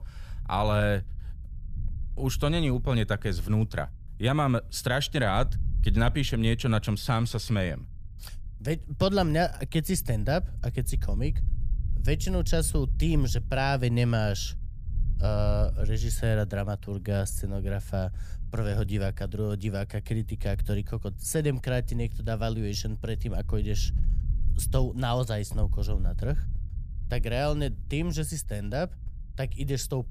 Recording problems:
low rumble; faint; throughout; 20 dB below the speech

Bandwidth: 14.5 kHz